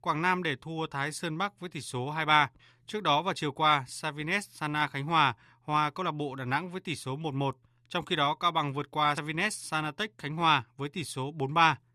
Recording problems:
none

